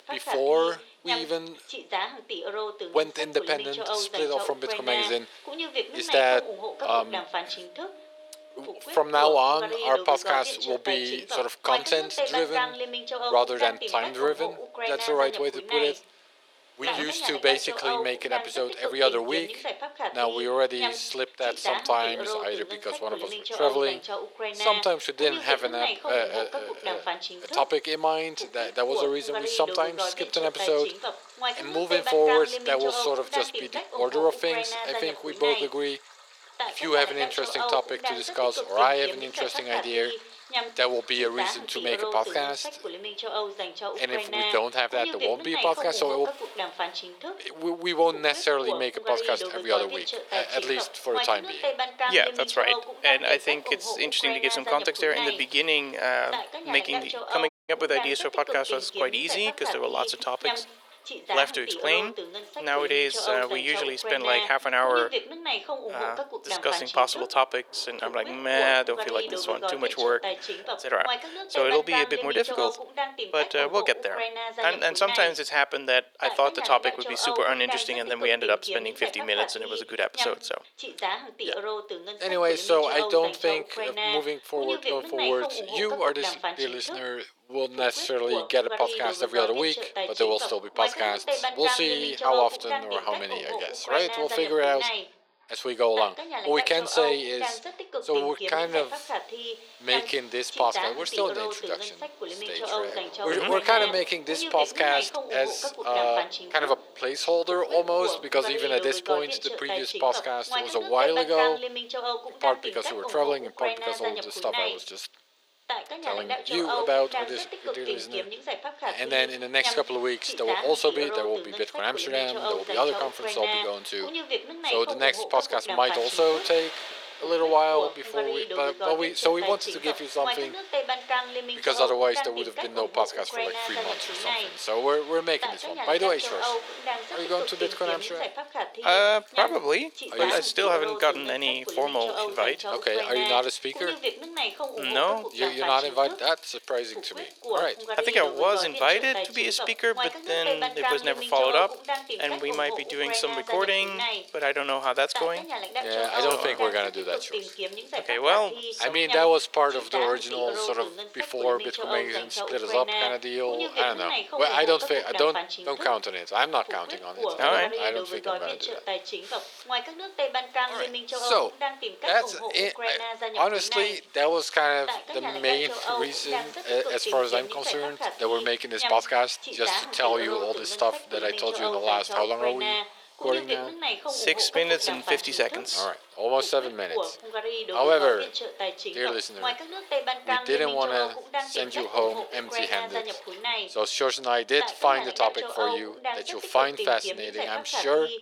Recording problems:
thin; very; fading below 450 Hz
voice in the background; loud; throughout; 5 dB below the speech
rain or running water; faint; throughout; 20 dB below the speech
audio cutting out; at 57 s

